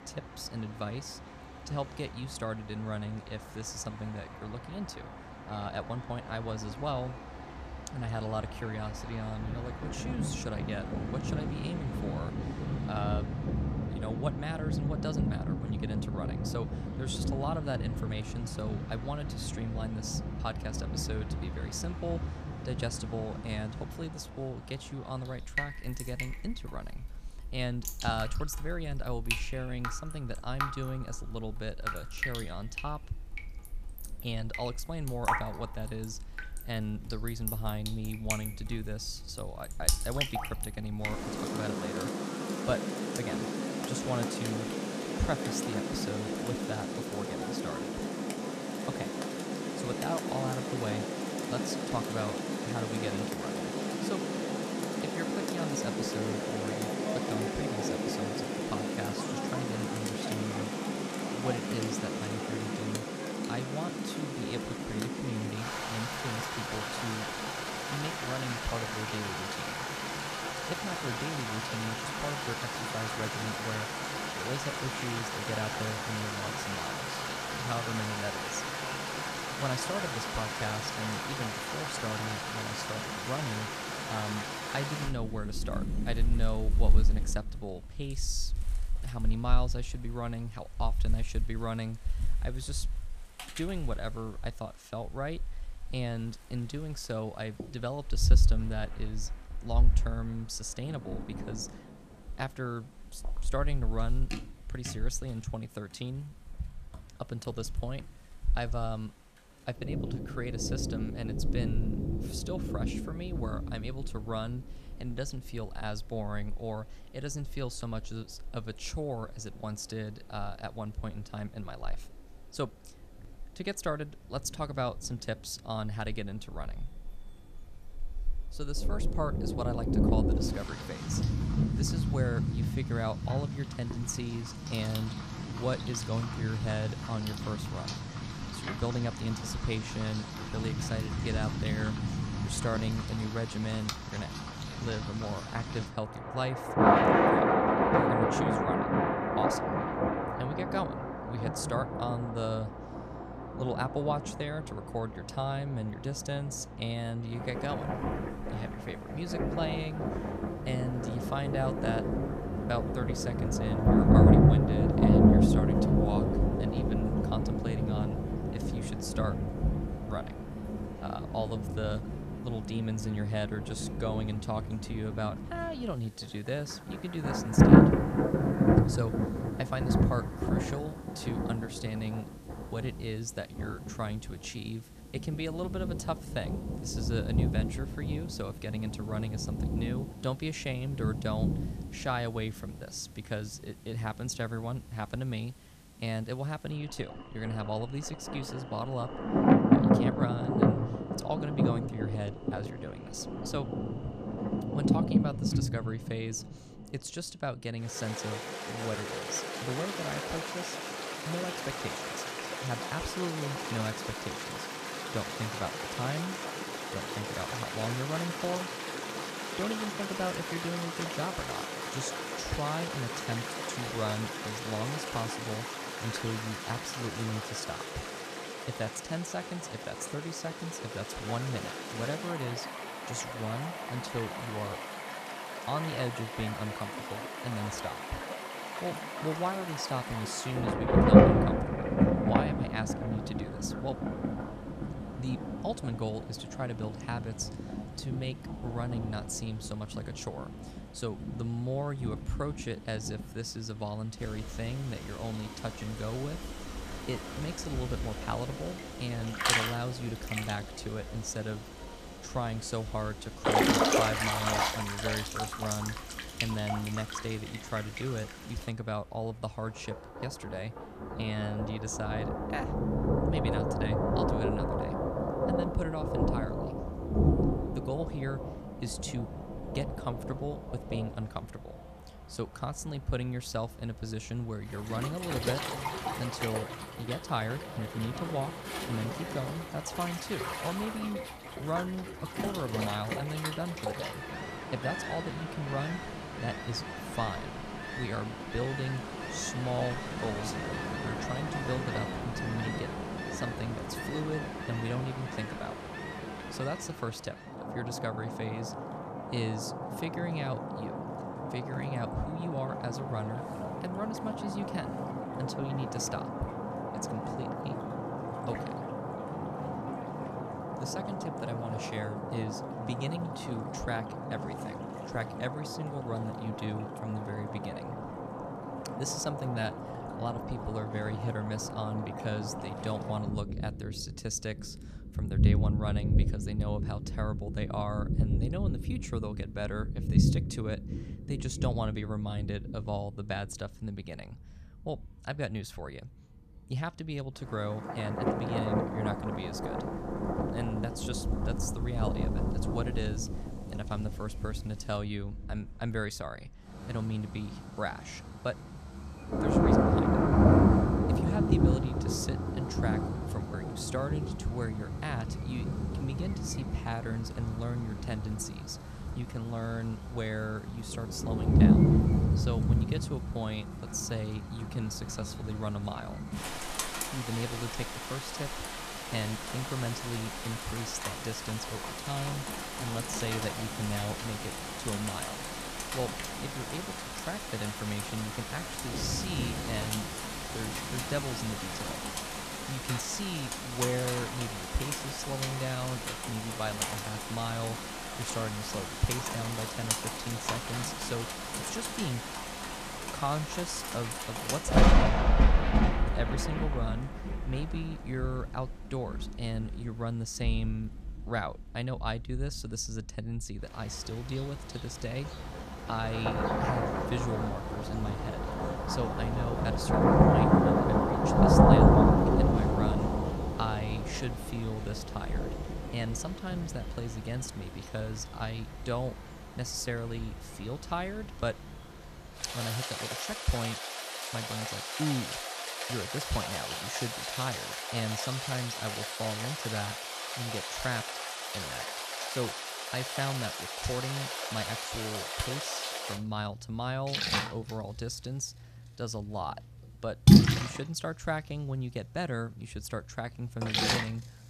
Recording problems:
rain or running water; very loud; throughout; 5 dB above the speech

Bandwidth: 14.5 kHz